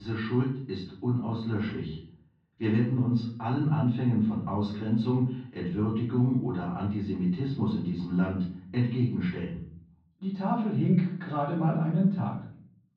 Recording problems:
off-mic speech; far
muffled; very; fading above 4 kHz
room echo; noticeable; dies away in 0.6 s
abrupt cut into speech; at the start

